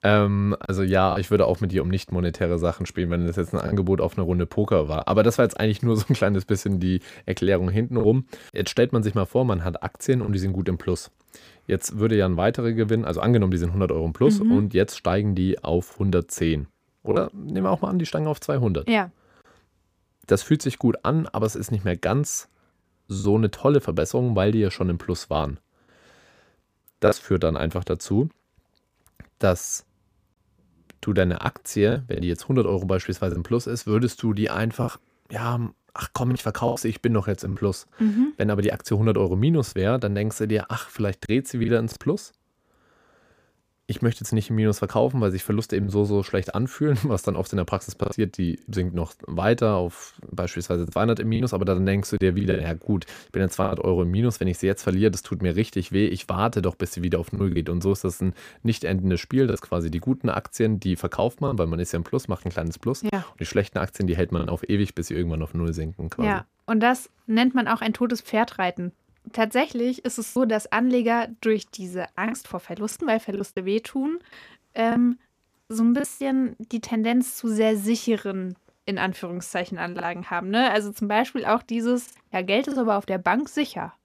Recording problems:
choppy; occasionally; 3% of the speech affected

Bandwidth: 15 kHz